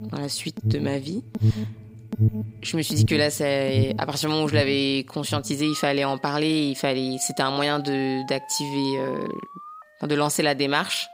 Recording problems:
alarms or sirens; loud; throughout; 5 dB below the speech

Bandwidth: 15.5 kHz